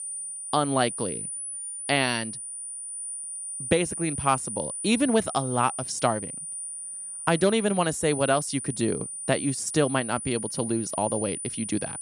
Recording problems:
high-pitched whine; loud; throughout; 9.5 kHz, 6 dB below the speech

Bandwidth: 13.5 kHz